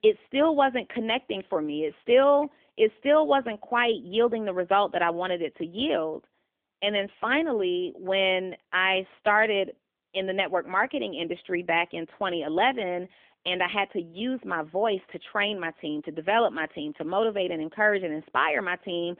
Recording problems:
phone-call audio; nothing above 3.5 kHz

